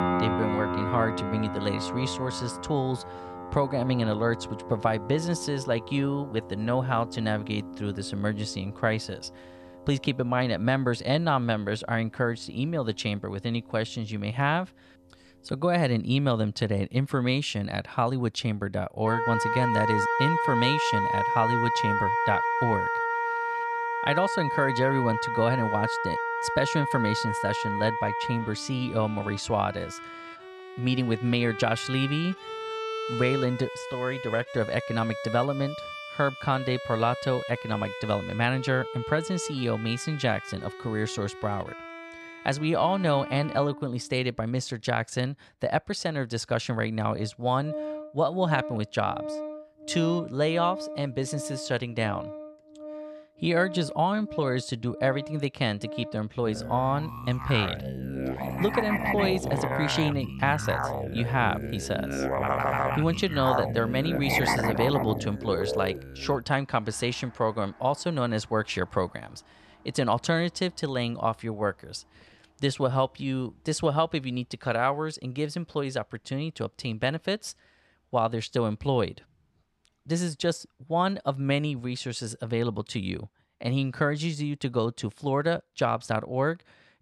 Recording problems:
background music; loud; throughout; 4 dB below the speech

